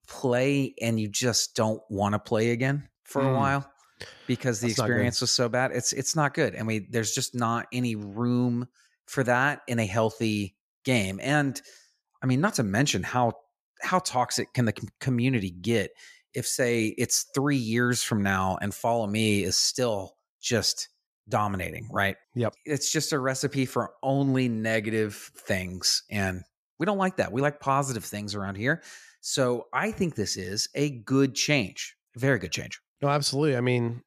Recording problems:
none

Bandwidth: 14.5 kHz